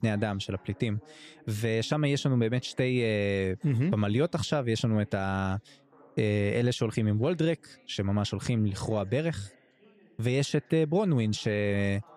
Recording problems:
background chatter; faint; throughout; 3 voices, 30 dB below the speech

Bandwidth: 15 kHz